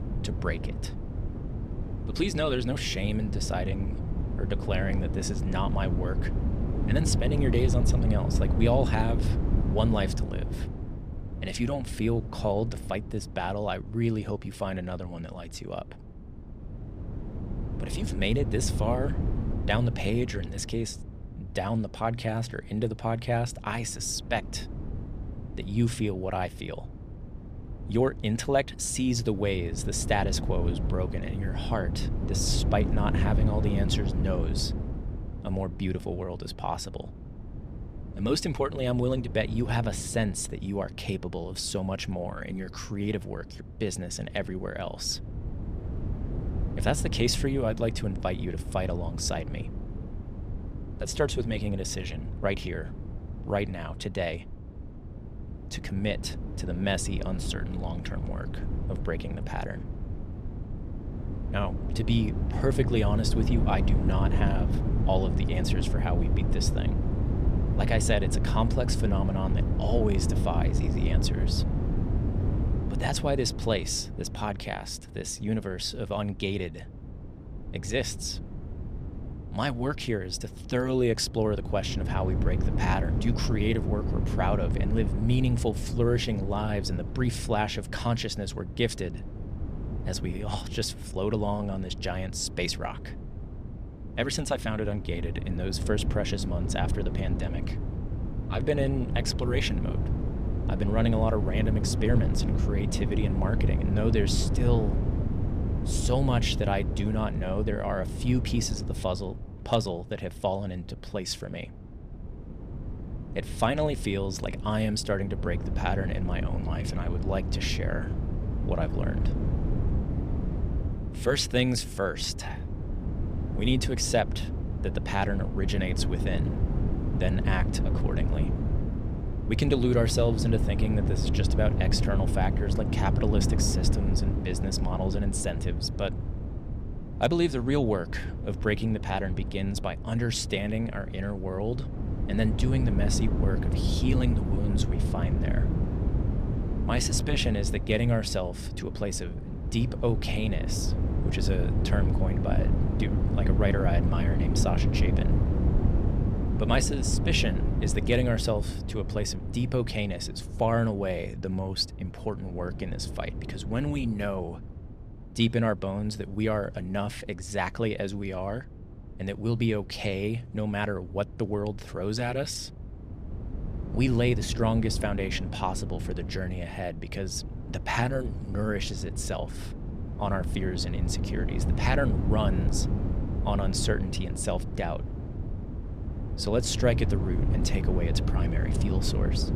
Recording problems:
wind noise on the microphone; heavy; 9 dB below the speech

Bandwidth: 15 kHz